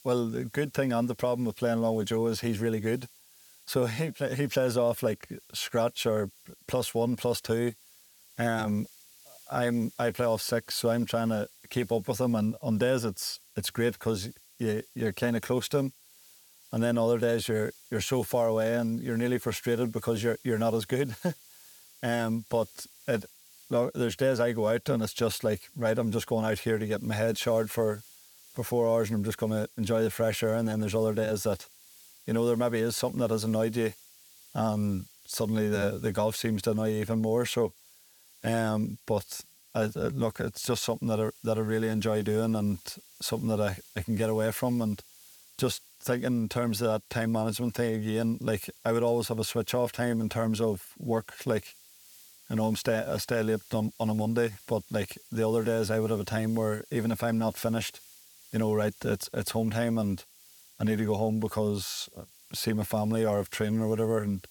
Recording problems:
hiss; faint; throughout; 25 dB below the speech

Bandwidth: 18.5 kHz